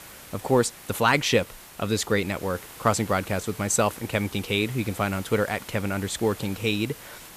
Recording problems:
hiss; noticeable; throughout; 15 dB below the speech

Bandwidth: 14.5 kHz